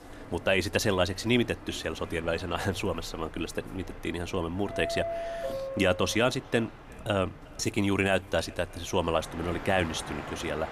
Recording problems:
echo of what is said; faint; throughout; 360 ms later, 25 dB below the speech
train or aircraft noise; noticeable; throughout; 10 dB below the speech

